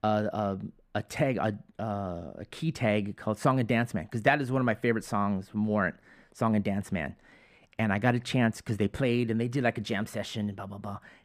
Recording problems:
muffled; slightly; fading above 3 kHz

